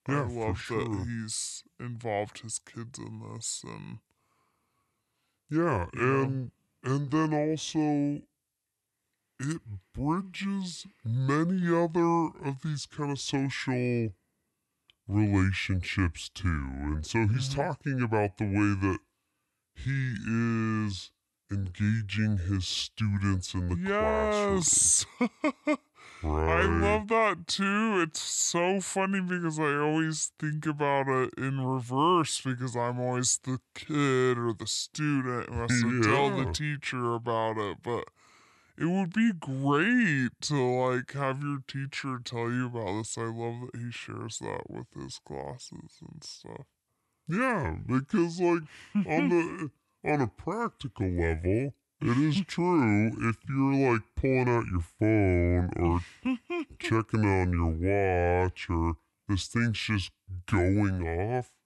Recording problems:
wrong speed and pitch; too slow and too low; 0.7 times normal speed

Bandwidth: 12 kHz